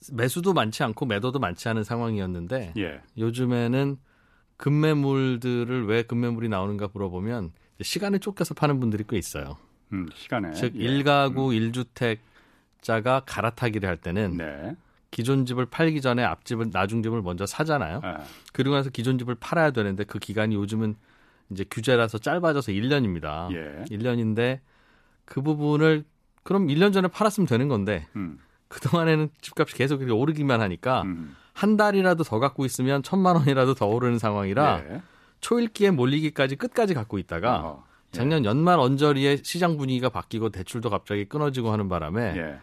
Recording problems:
none

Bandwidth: 14 kHz